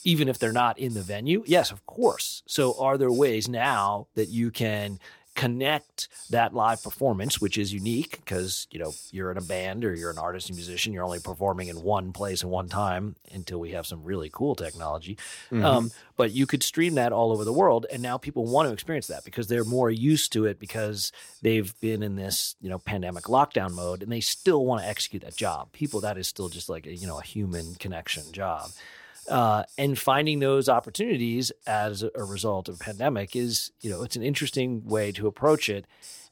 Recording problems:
hiss; noticeable; throughout; 20 dB below the speech

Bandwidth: 17 kHz